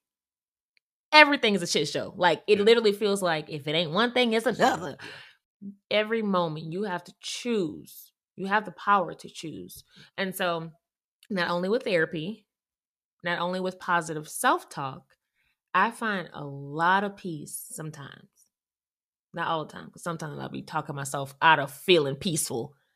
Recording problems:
none

